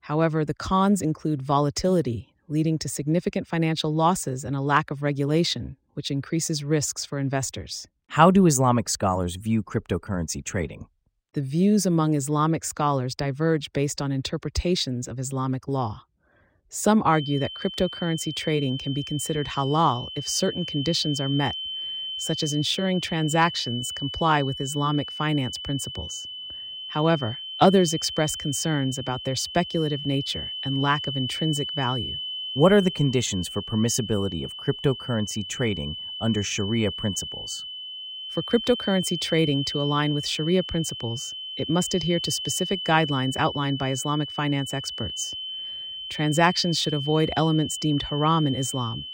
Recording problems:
high-pitched whine; loud; from 17 s on; 3 kHz, 7 dB below the speech

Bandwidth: 16 kHz